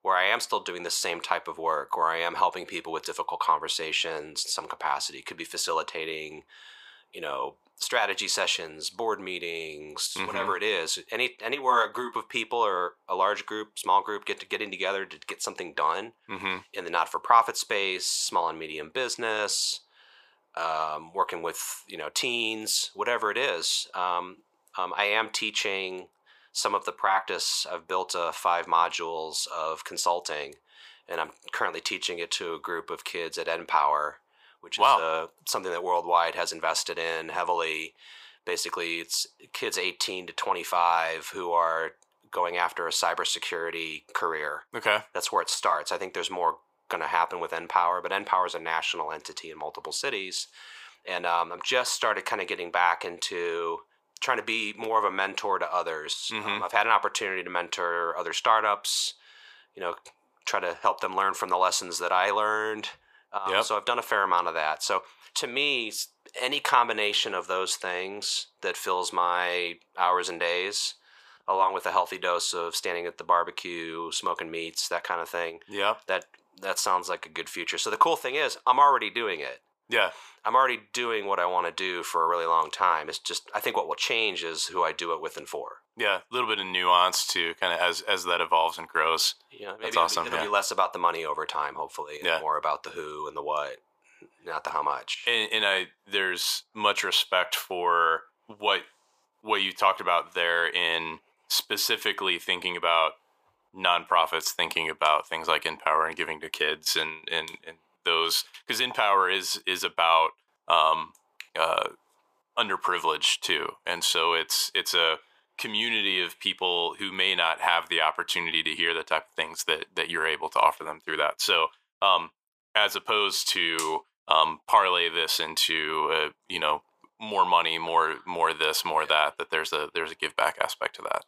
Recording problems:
thin; very; fading below 450 Hz

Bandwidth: 15 kHz